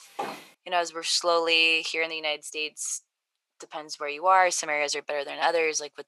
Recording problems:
thin; very; fading below 550 Hz
footsteps; faint; at the start; peak 10 dB below the speech

